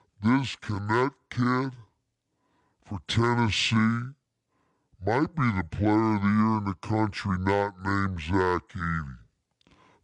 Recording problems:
wrong speed and pitch; too slow and too low; 0.6 times normal speed

